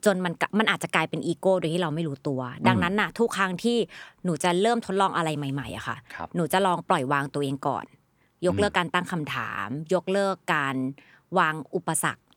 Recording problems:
none

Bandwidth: 18.5 kHz